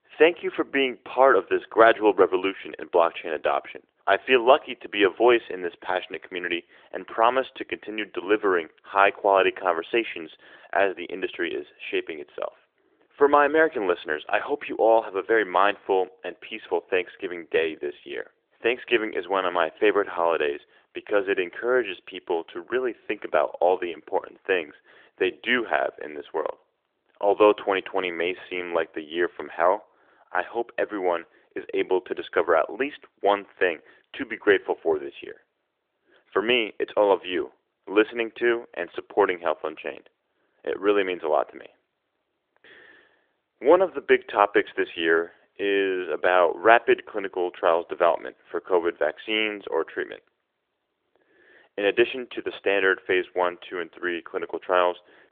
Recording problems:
phone-call audio; nothing above 3.5 kHz

